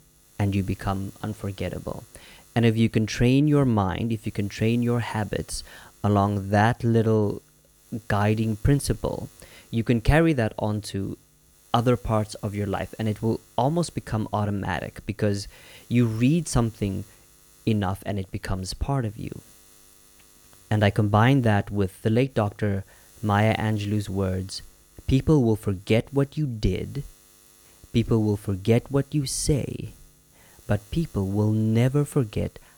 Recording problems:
electrical hum; faint; throughout; 60 Hz, 30 dB below the speech

